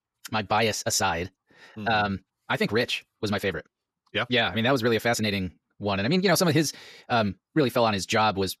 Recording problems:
wrong speed, natural pitch; too fast; 1.7 times normal speed

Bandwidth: 14 kHz